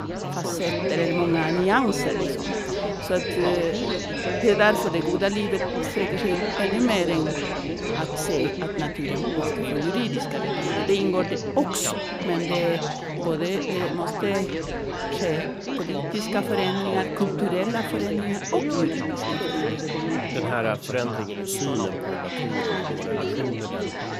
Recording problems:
chatter from many people; loud; throughout; 1 dB below the speech

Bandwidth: 15.5 kHz